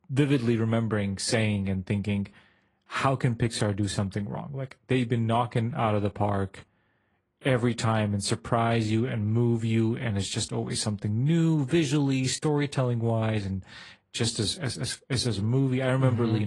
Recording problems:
garbled, watery; slightly; nothing above 10 kHz
abrupt cut into speech; at the end

